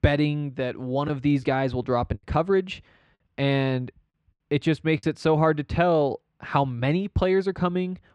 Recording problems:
muffled; slightly; fading above 3 kHz
choppy; occasionally; from 1 to 5 s; 5% of the speech affected

